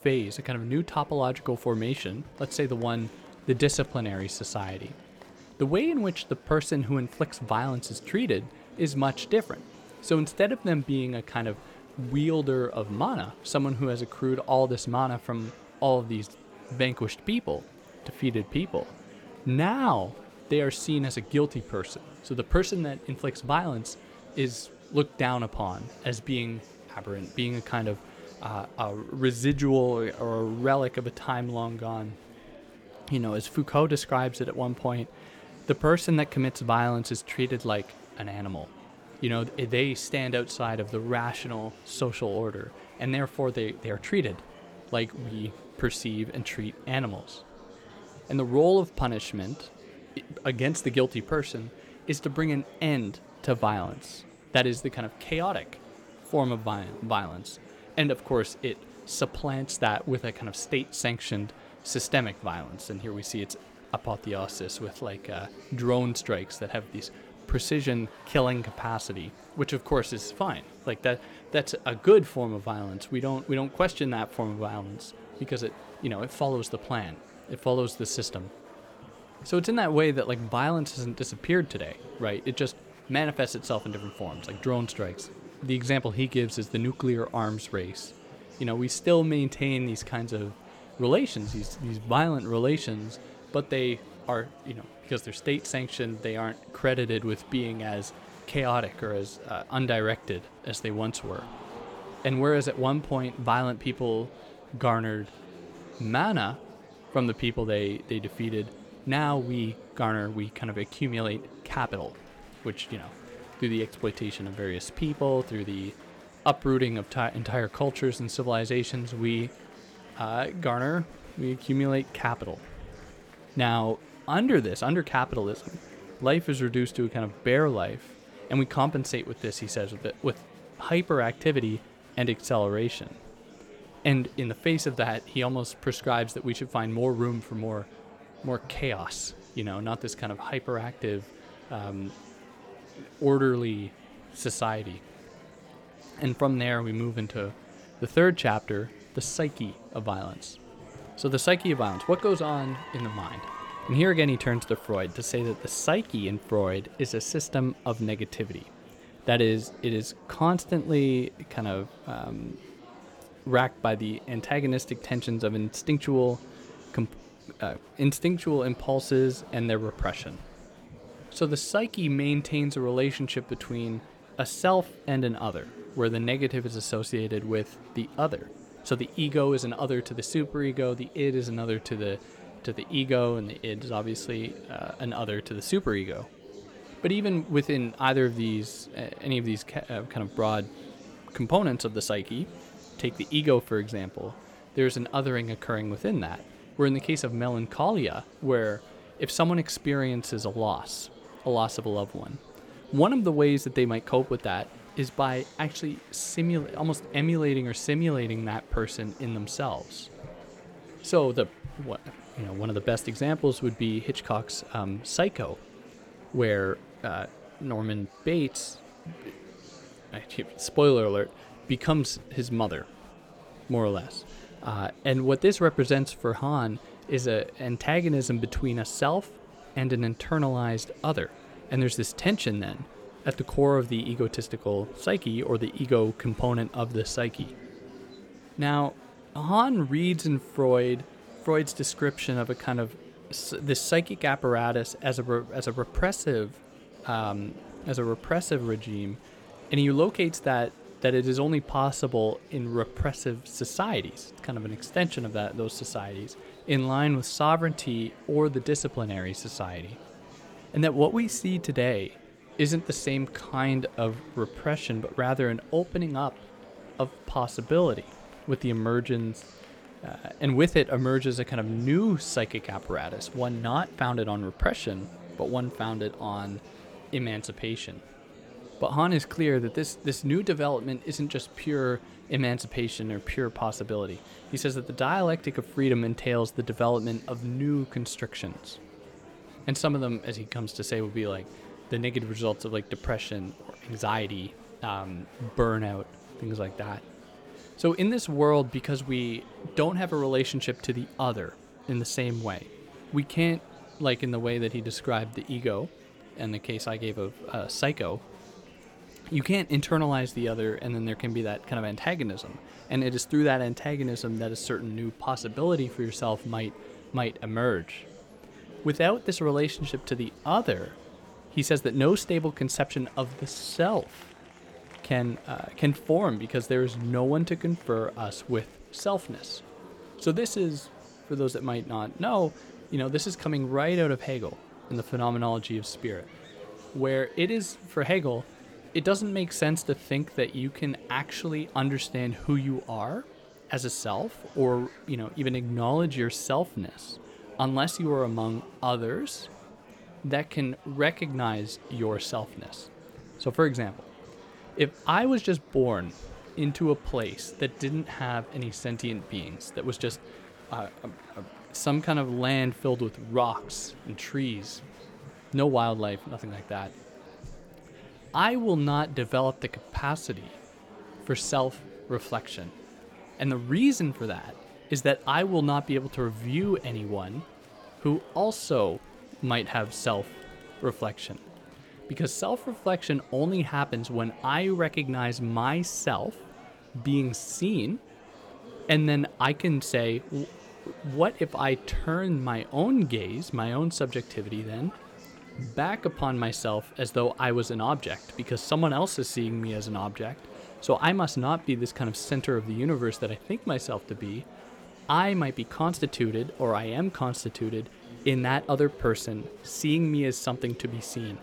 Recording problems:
murmuring crowd; noticeable; throughout; 20 dB below the speech

